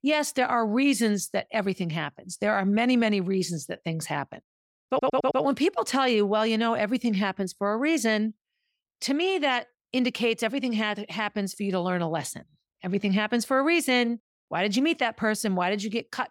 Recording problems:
audio stuttering; at 5 s

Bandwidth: 17 kHz